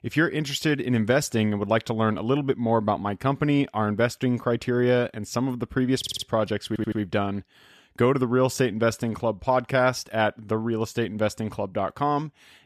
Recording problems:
audio stuttering; at 6 s and at 6.5 s

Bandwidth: 14.5 kHz